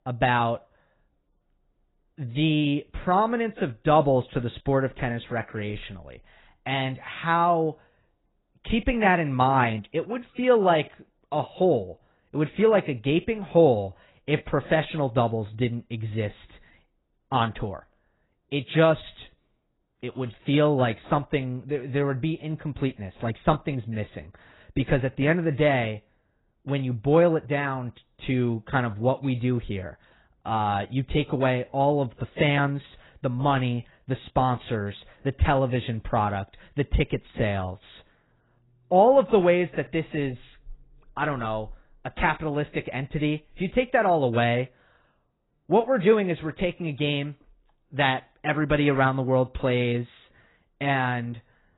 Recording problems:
garbled, watery; badly; nothing above 4 kHz

